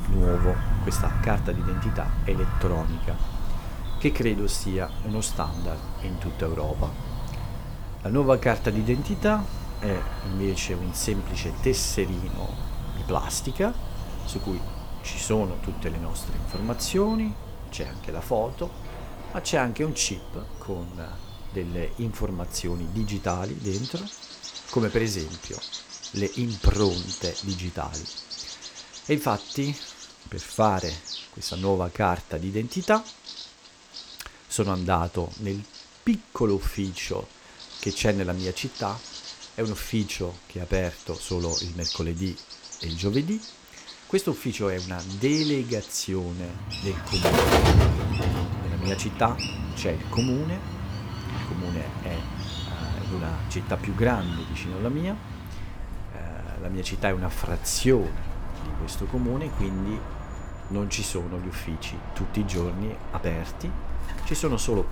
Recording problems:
animal sounds; loud; throughout; 4 dB below the speech

